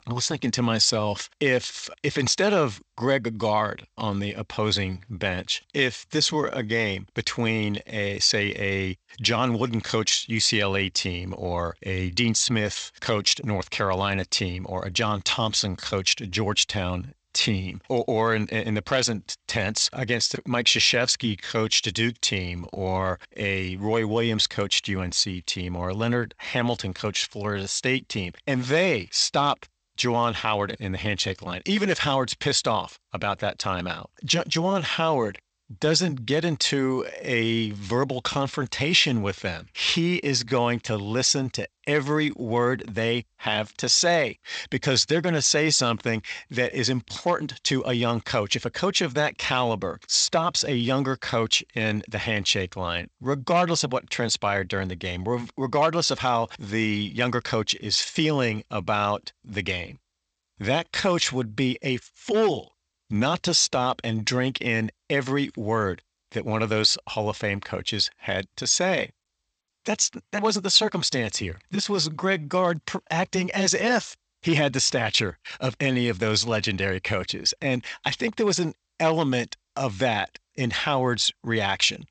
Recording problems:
garbled, watery; slightly; nothing above 8 kHz

